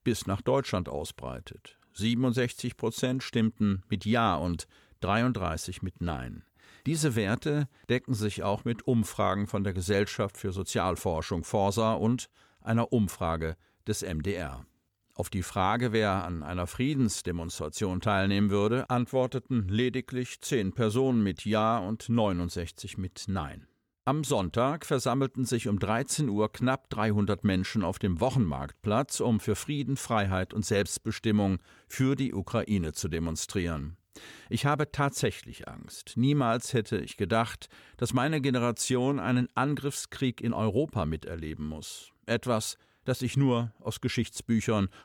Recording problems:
none

